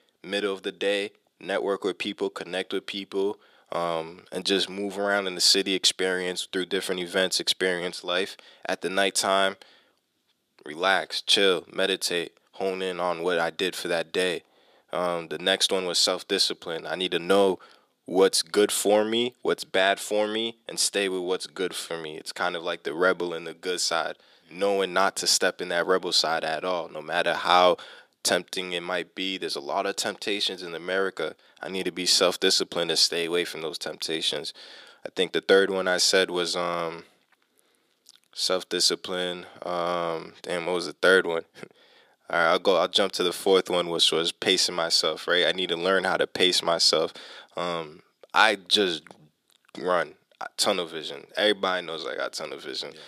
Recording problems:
thin; somewhat; fading below 400 Hz

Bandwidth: 15 kHz